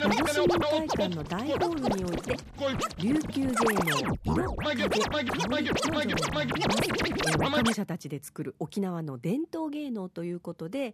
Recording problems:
background music; very loud; throughout; 4 dB above the speech

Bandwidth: 14.5 kHz